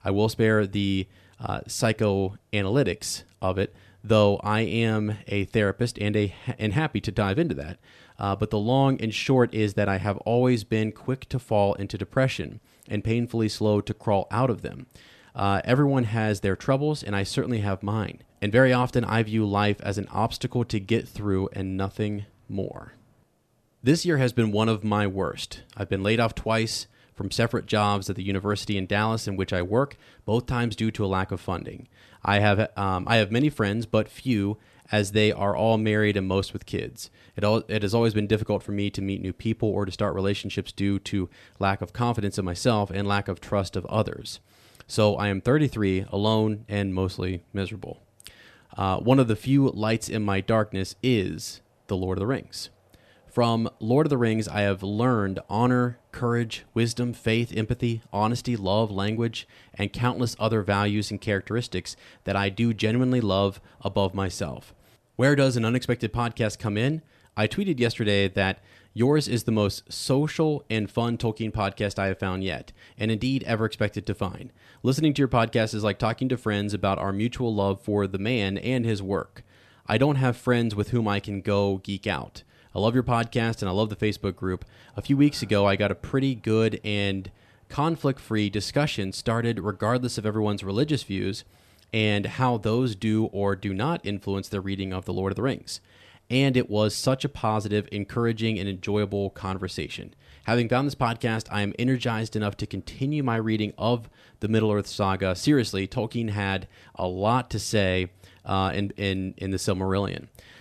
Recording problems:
none

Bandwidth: 13.5 kHz